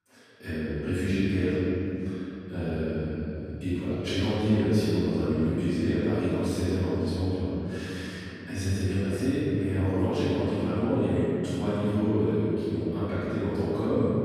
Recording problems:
room echo; strong; dies away in 3 s
off-mic speech; far

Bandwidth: 14.5 kHz